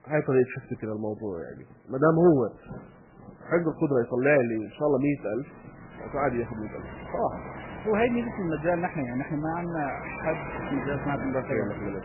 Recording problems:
garbled, watery; badly; nothing above 2.5 kHz
rain or running water; noticeable; throughout; 10 dB below the speech

